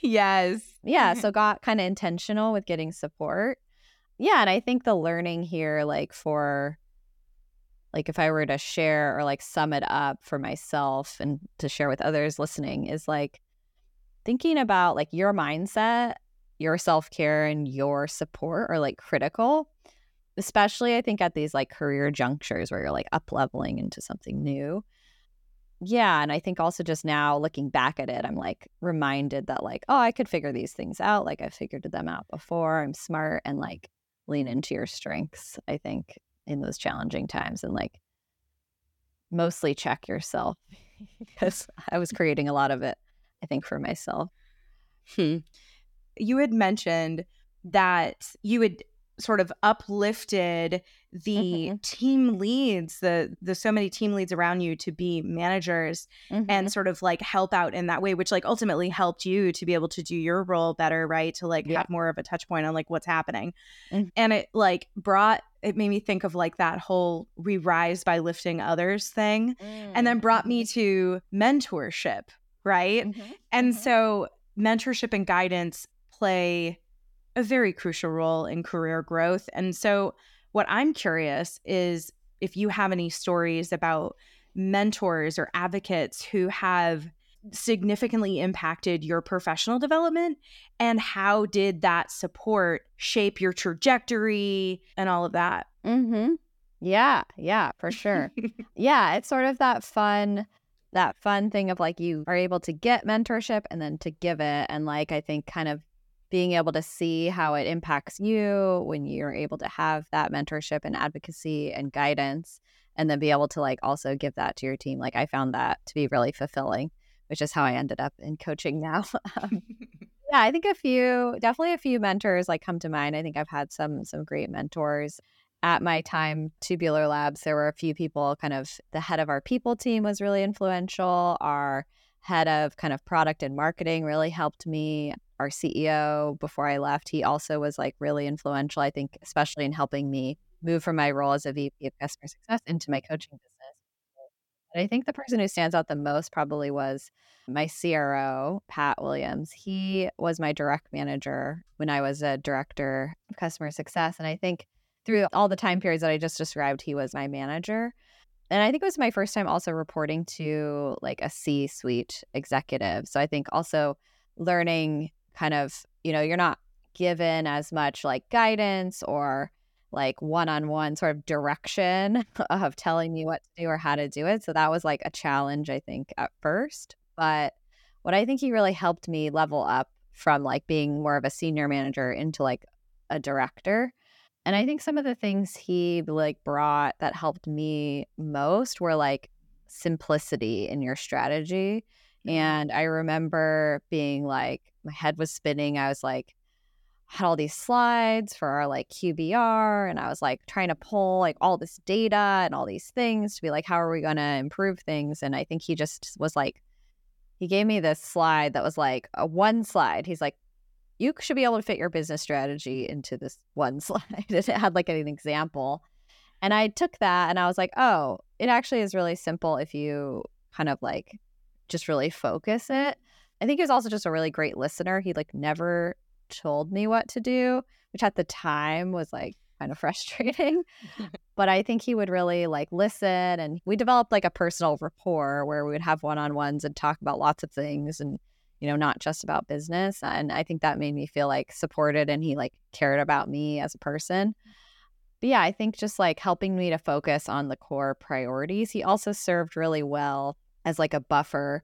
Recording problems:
none

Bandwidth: 17.5 kHz